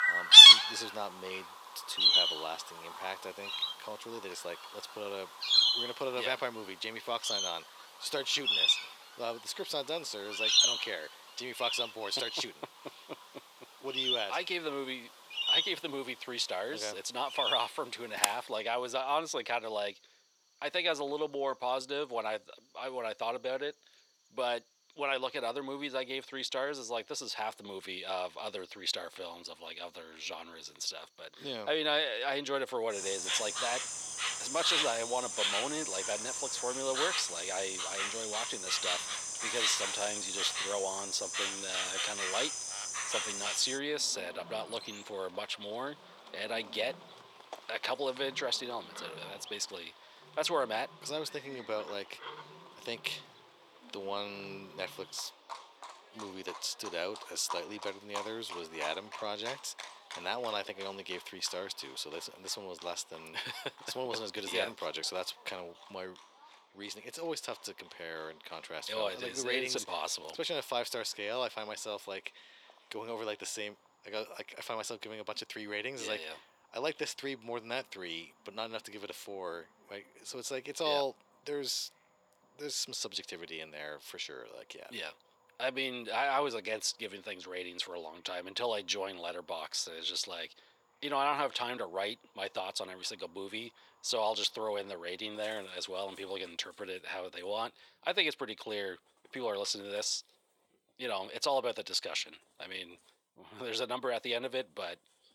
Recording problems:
thin; very; fading below 550 Hz
animal sounds; very loud; throughout; 10 dB above the speech

